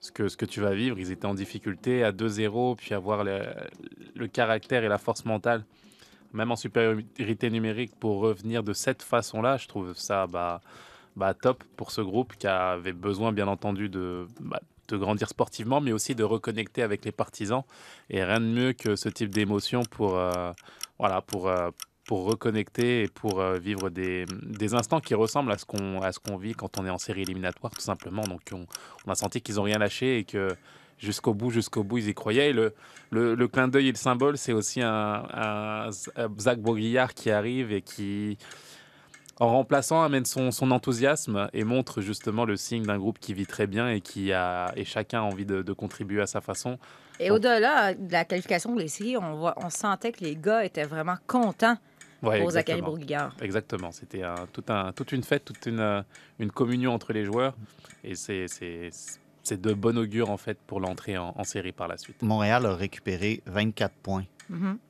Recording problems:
household noises; faint; throughout; 20 dB below the speech

